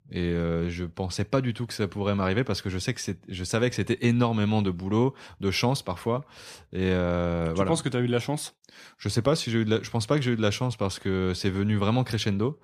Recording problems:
none

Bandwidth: 14.5 kHz